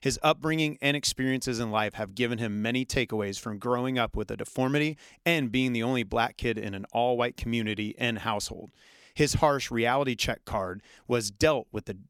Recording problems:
none

